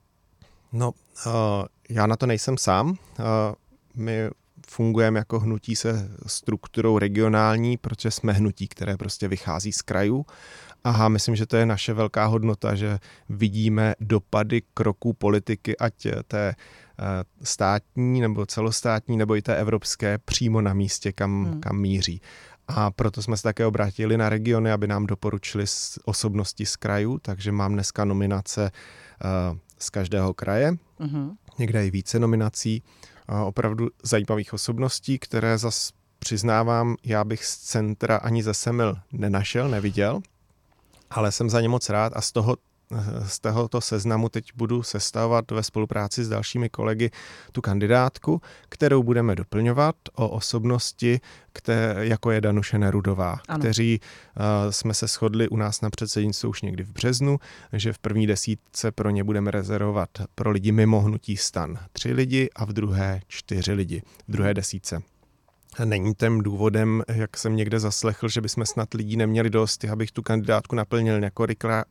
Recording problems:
none

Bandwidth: 17.5 kHz